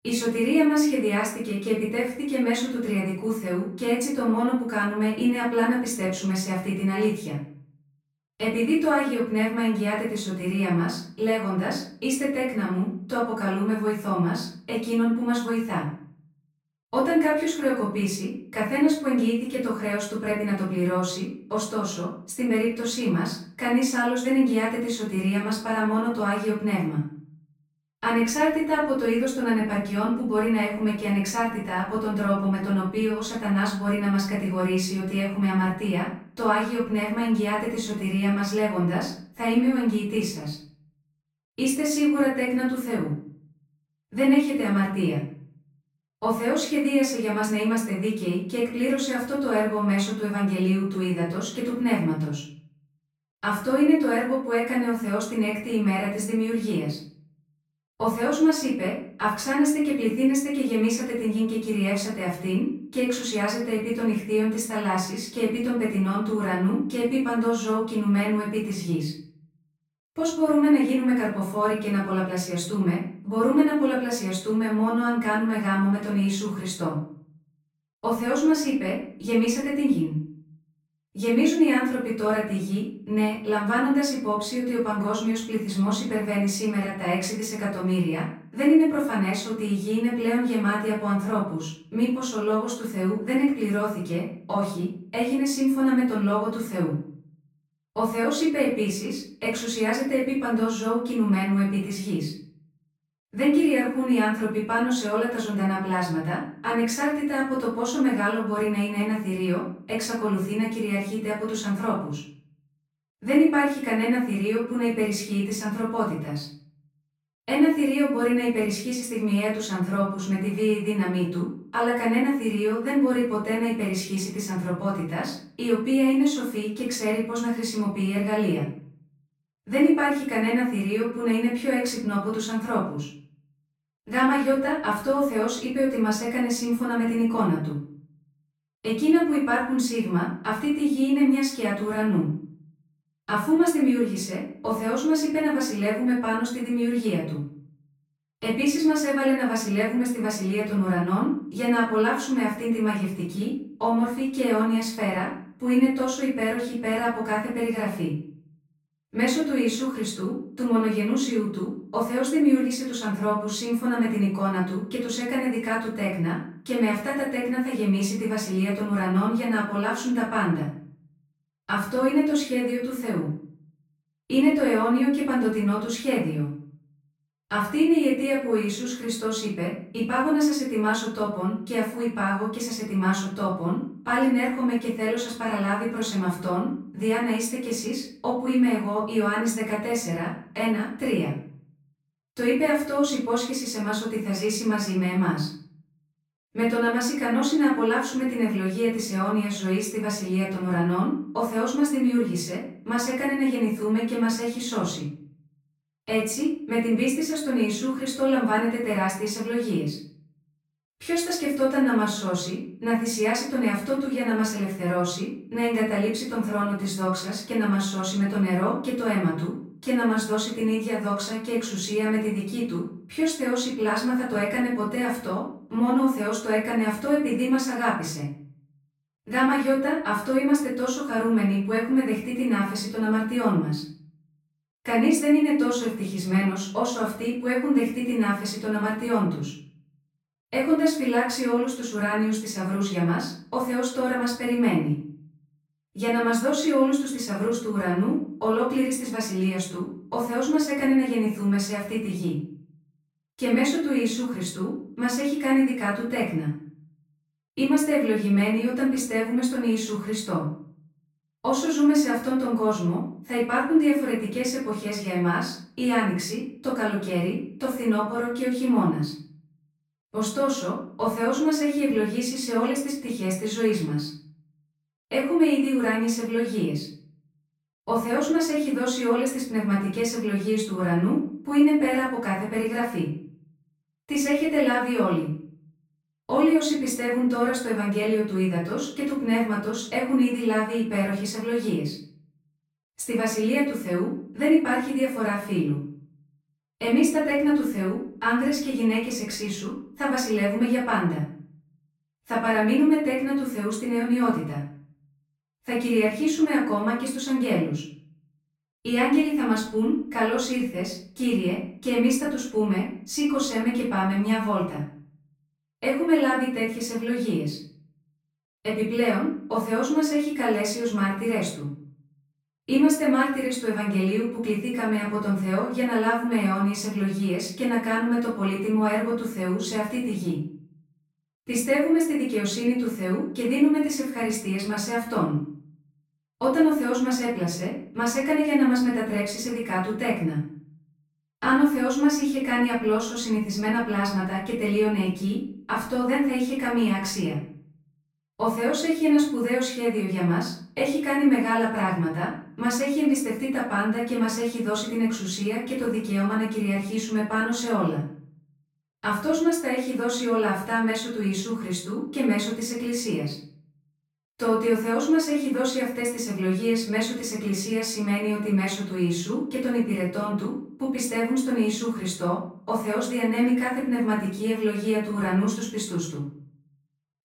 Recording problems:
off-mic speech; far
room echo; noticeable; dies away in 0.5 s

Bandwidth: 16 kHz